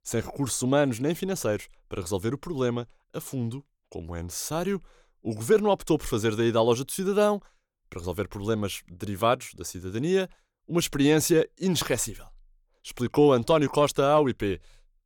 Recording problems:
none

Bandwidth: 18 kHz